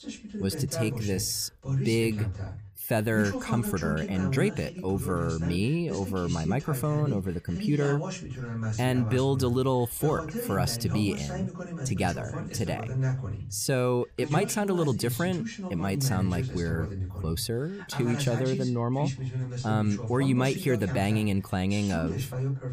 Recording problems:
voice in the background; loud; throughout; 6 dB below the speech

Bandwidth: 15 kHz